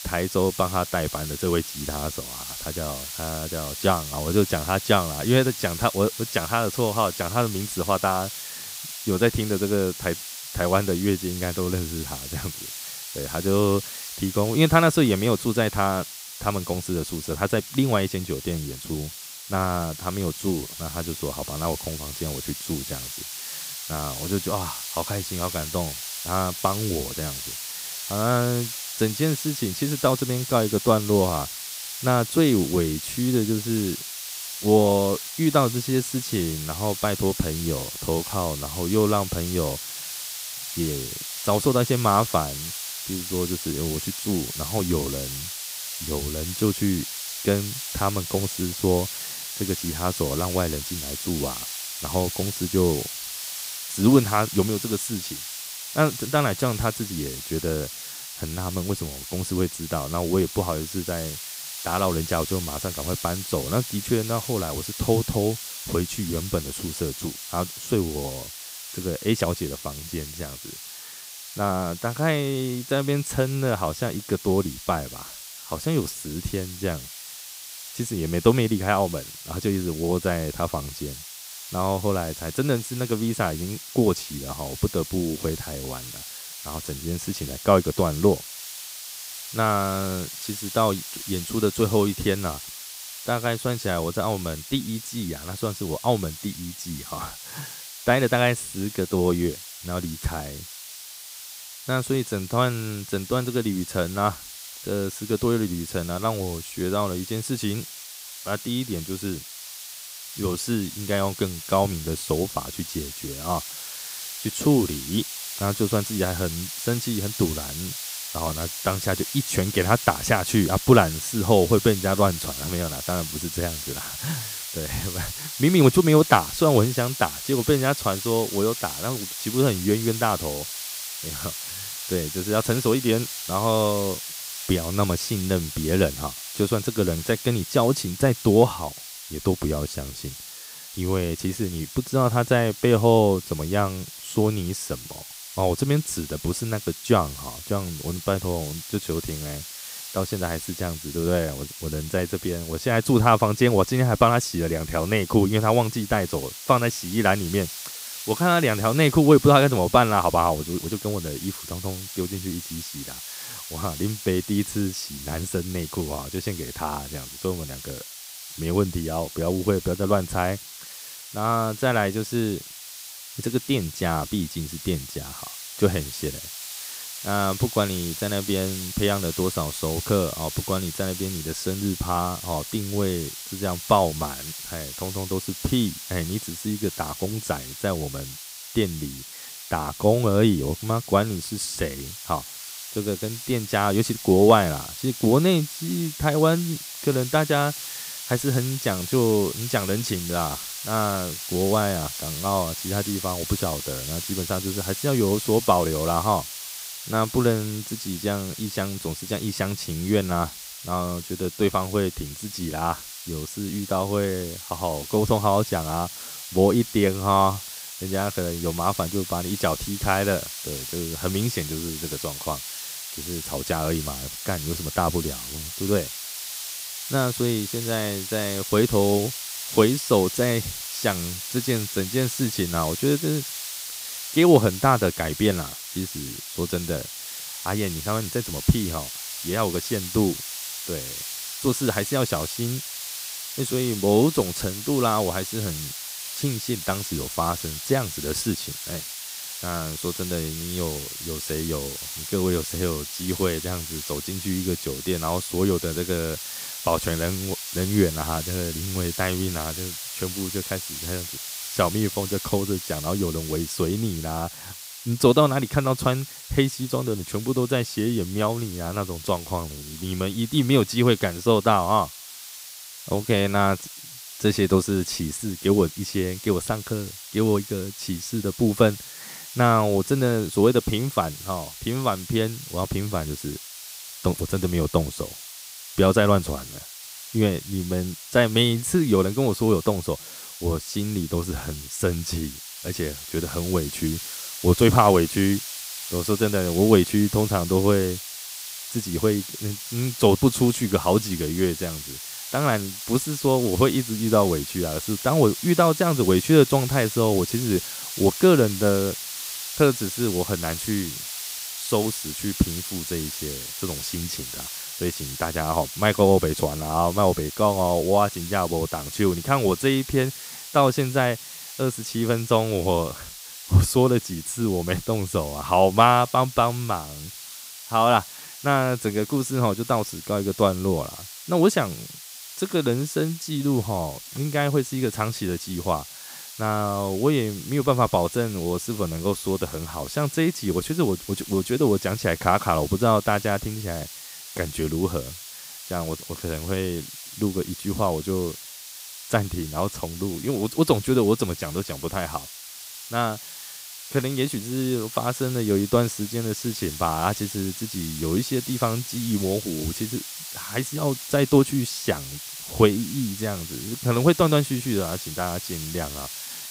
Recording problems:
hiss; loud; throughout; 9 dB below the speech

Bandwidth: 15.5 kHz